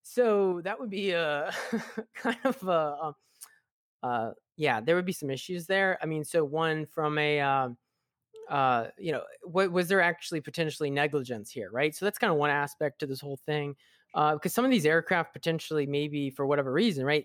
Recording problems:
none

